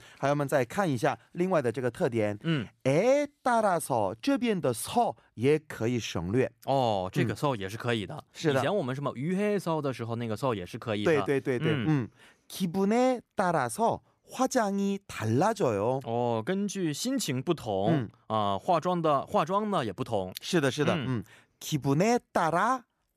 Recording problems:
none

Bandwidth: 14.5 kHz